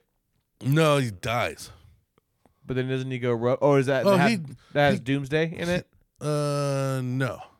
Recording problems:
none

